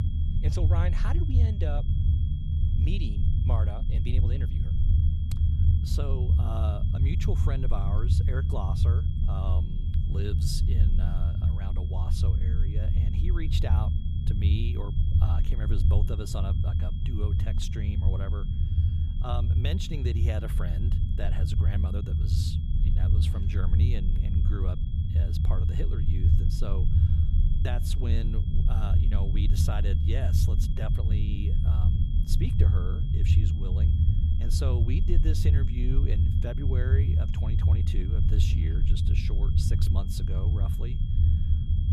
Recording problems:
low rumble; loud; throughout; 1 dB below the speech
high-pitched whine; noticeable; throughout; 3.5 kHz, 15 dB below the speech

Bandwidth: 14.5 kHz